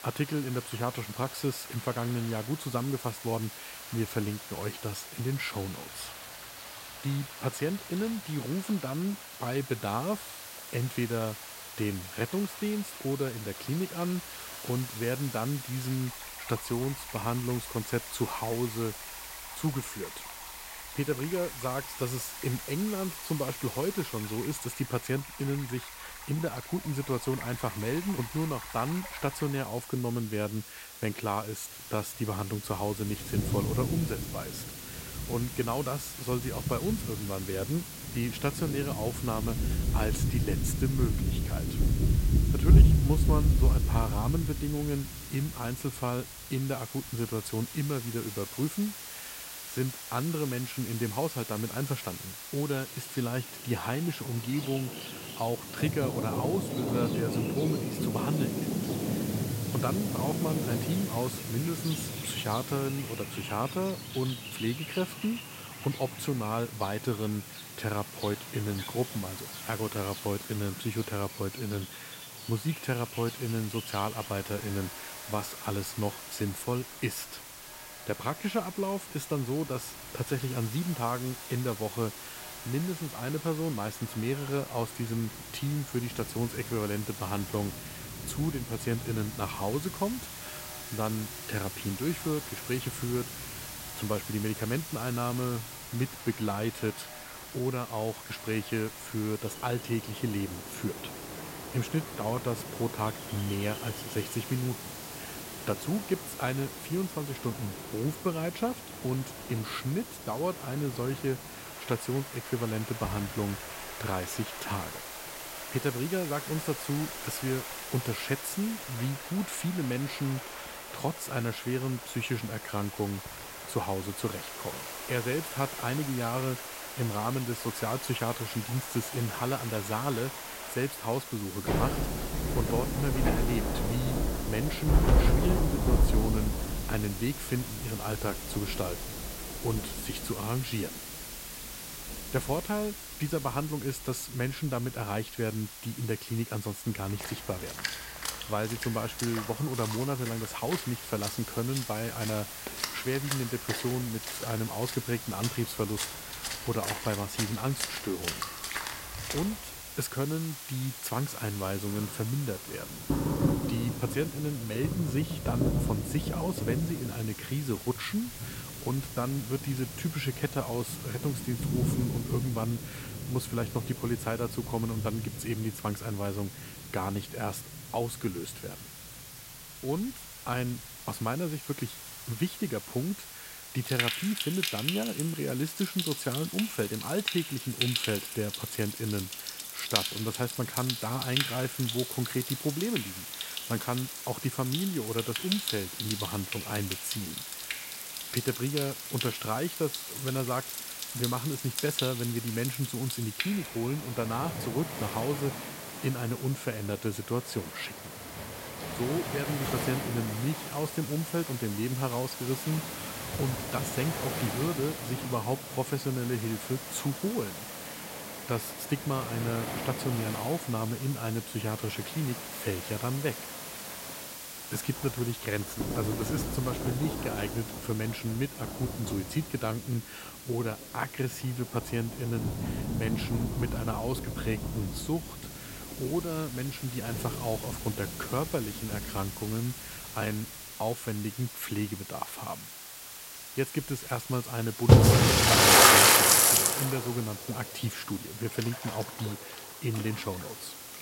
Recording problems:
rain or running water; very loud; throughout; 1 dB above the speech
hiss; loud; throughout; 8 dB below the speech

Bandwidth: 16 kHz